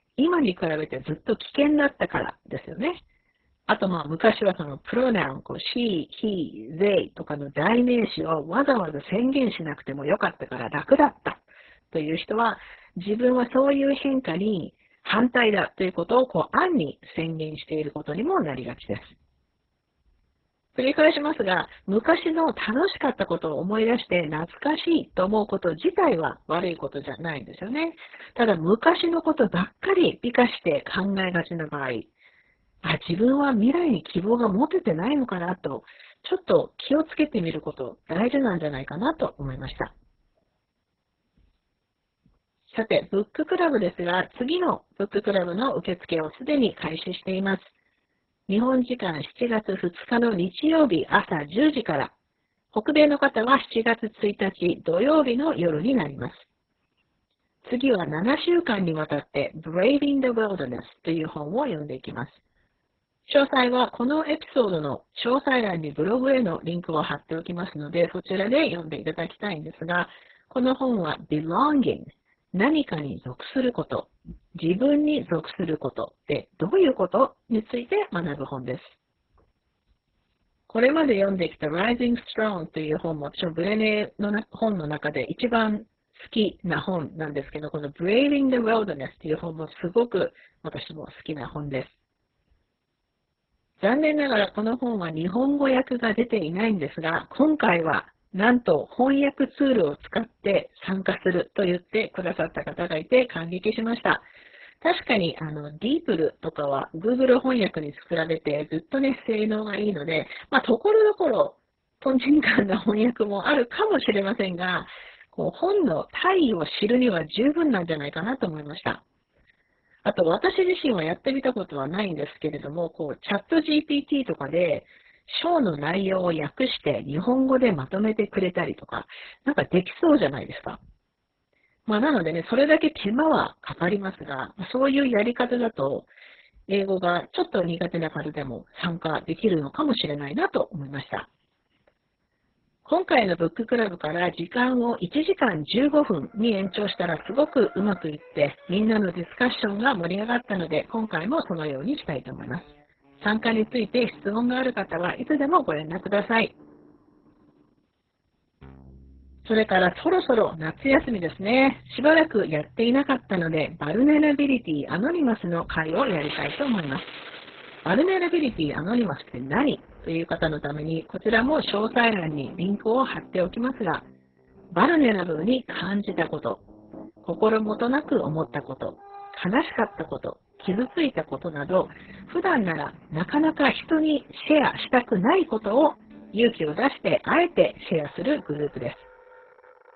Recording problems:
garbled, watery; badly; nothing above 4 kHz
background music; faint; from 2:26 on; 20 dB below the speech

